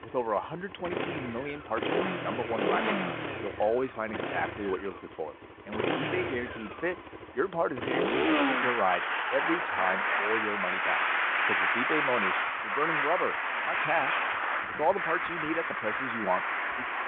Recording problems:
phone-call audio
traffic noise; very loud; throughout; 4 dB above the speech

